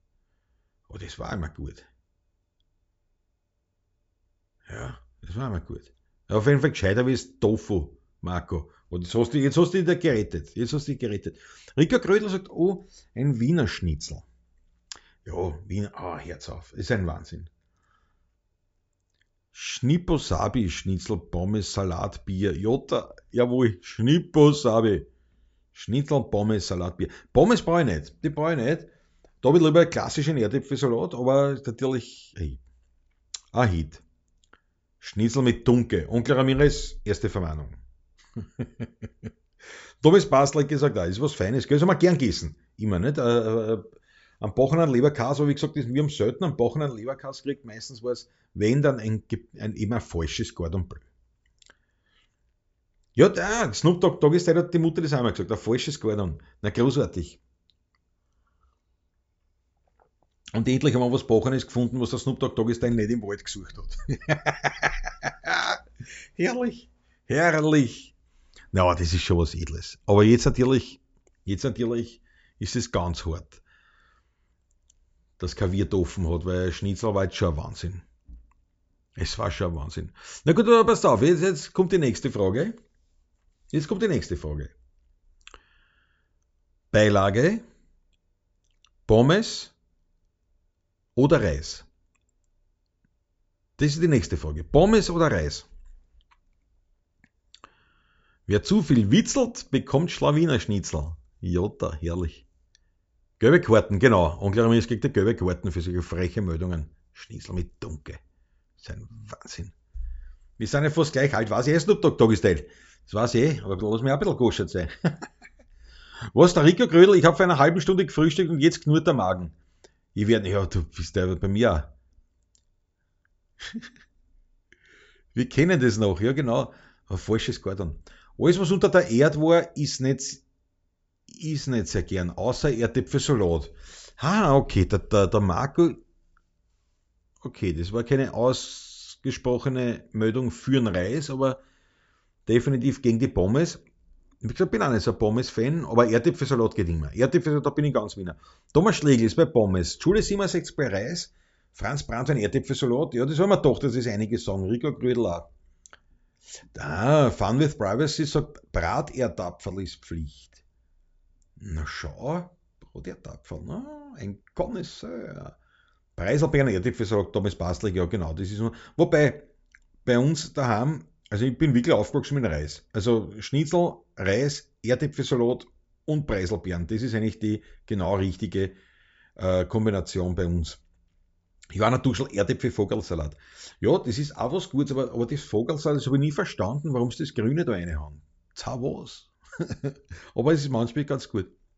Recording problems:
high frequencies cut off; noticeable; nothing above 8 kHz

